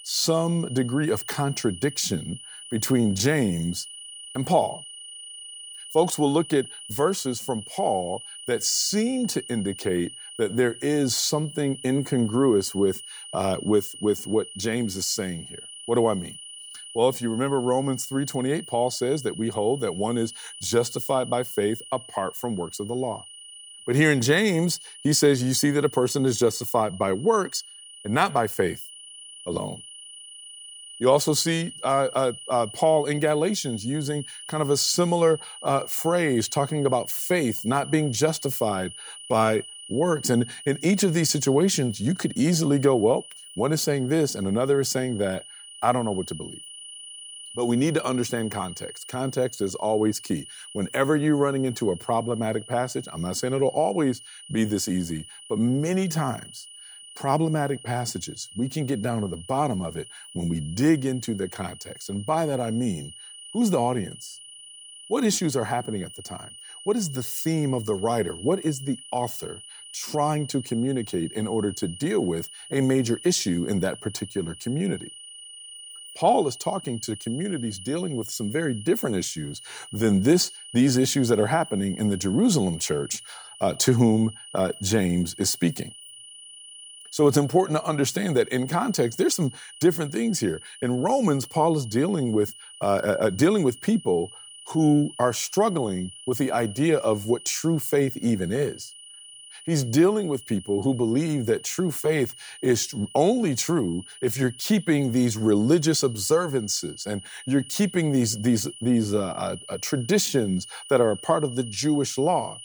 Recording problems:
high-pitched whine; noticeable; throughout; 3 kHz, 15 dB below the speech

